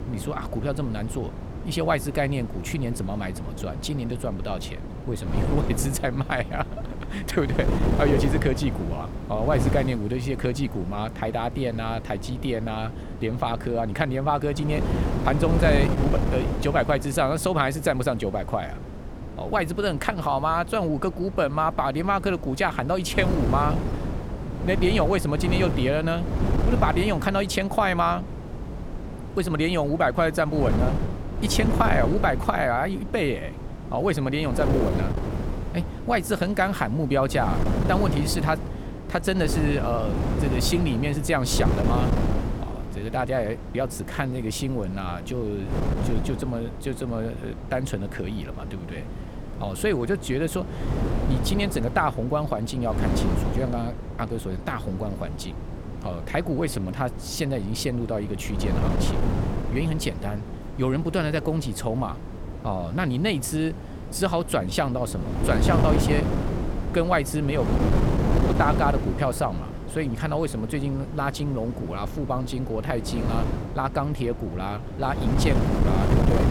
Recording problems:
wind noise on the microphone; heavy; 8 dB below the speech

